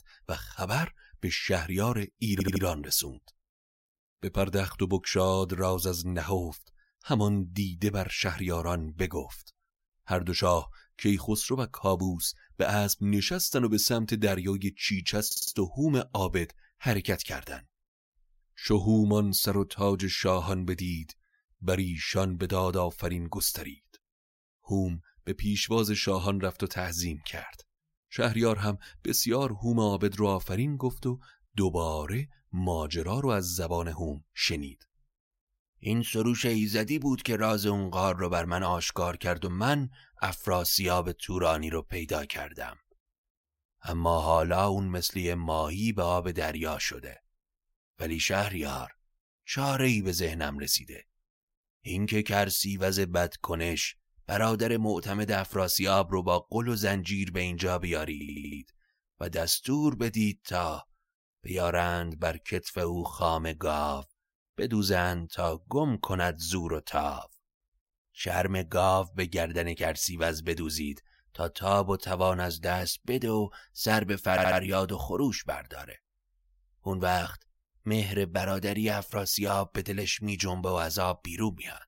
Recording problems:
audio stuttering; 4 times, first at 2.5 s

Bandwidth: 16 kHz